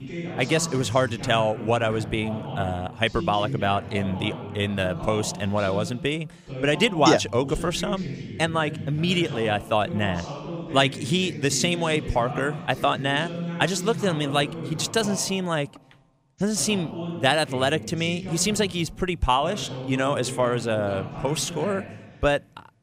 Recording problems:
voice in the background; loud; throughout; 10 dB below the speech

